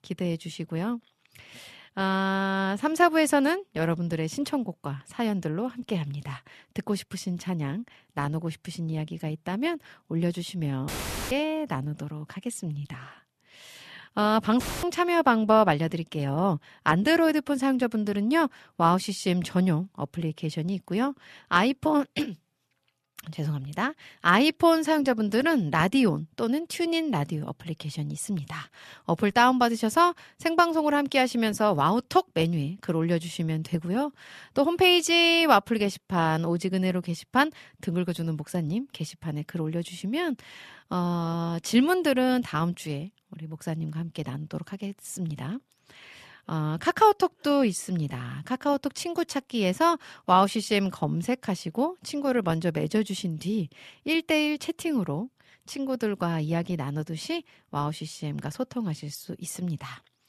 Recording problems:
audio cutting out; filled with static; at 11 s and at 15 s

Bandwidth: 13.5 kHz